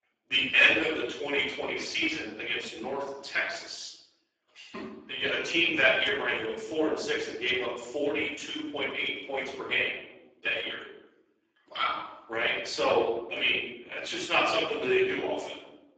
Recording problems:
off-mic speech; far
garbled, watery; badly; nothing above 7.5 kHz
room echo; noticeable; dies away in 0.8 s
thin; somewhat; fading below 350 Hz

